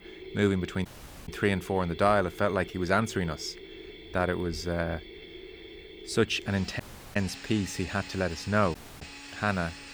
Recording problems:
machinery noise; noticeable; throughout; 15 dB below the speech
audio cutting out; at 1 s, at 7 s and at 9 s

